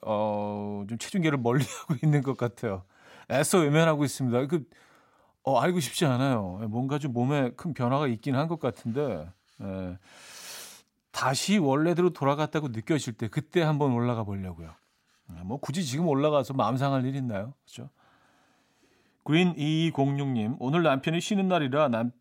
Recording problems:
none

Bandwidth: 16 kHz